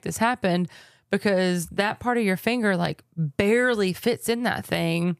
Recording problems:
none

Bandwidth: 15 kHz